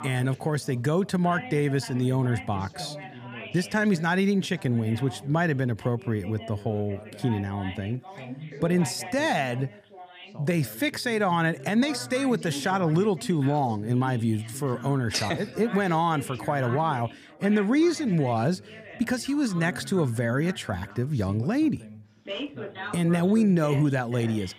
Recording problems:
background chatter; noticeable; throughout; 2 voices, 15 dB below the speech

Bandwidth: 15 kHz